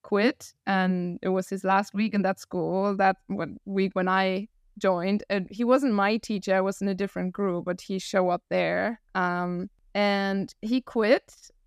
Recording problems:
none

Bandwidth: 14.5 kHz